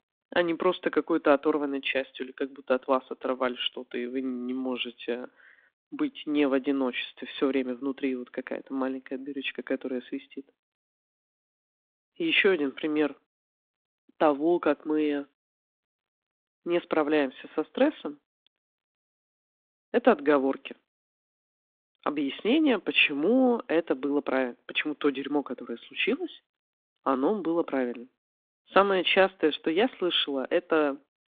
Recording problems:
phone-call audio

